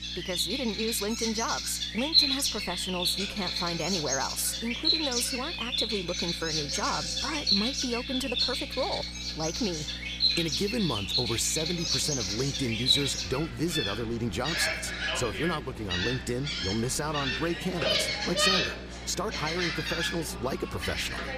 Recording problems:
animal sounds; very loud; throughout; 3 dB above the speech
electrical hum; faint; throughout; 60 Hz, 20 dB below the speech

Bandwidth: 15 kHz